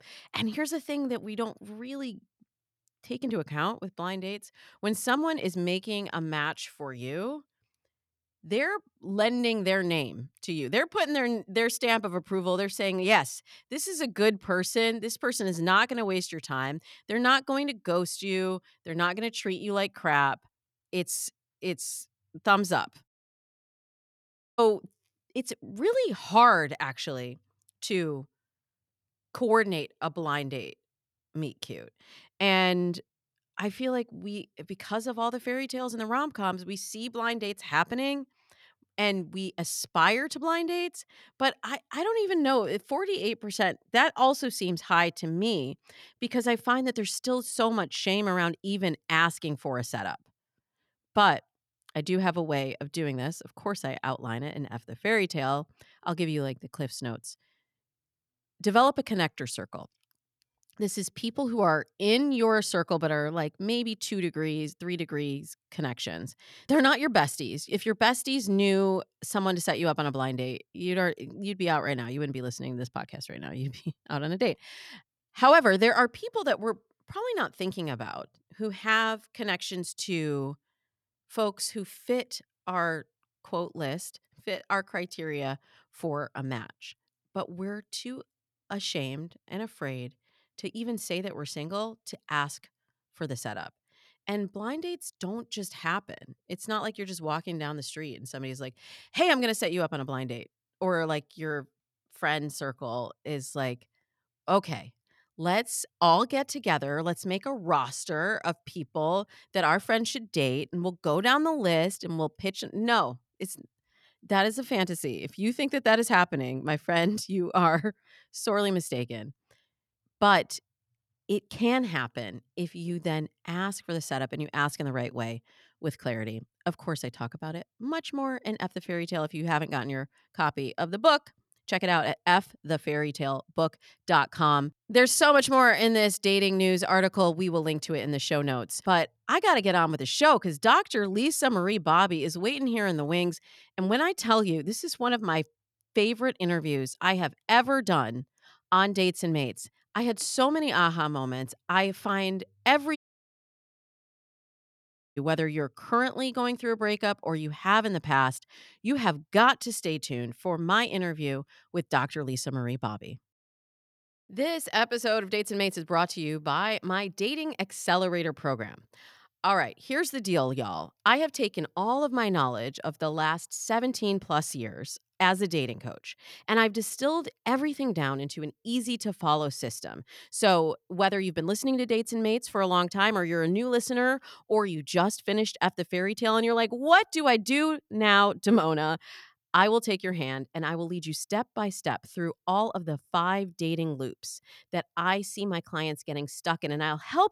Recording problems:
audio cutting out; at 23 s for 1.5 s and at 2:33 for 2 s

